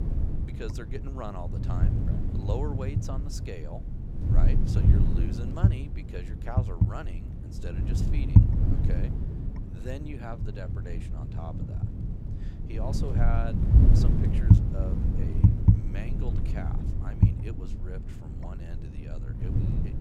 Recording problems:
wind noise on the microphone; heavy; 3 dB above the speech

